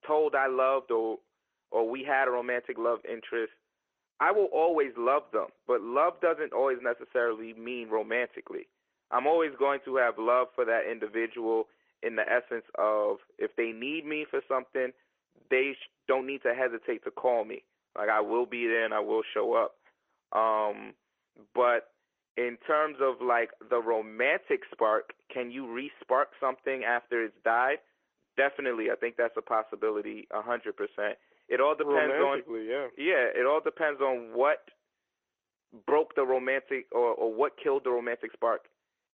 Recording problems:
phone-call audio
garbled, watery; slightly

